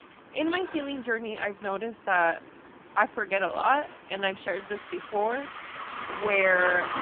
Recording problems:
phone-call audio; poor line
traffic noise; noticeable; throughout; 10 dB below the speech

